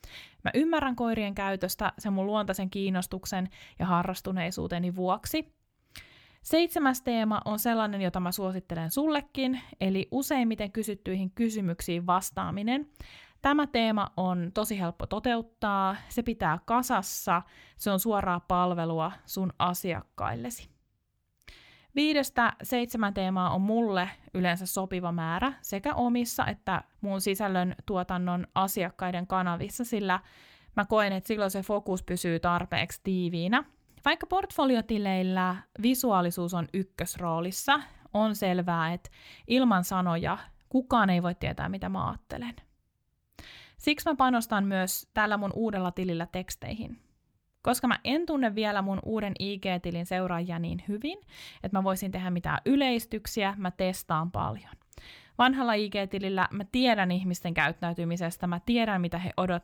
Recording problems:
none

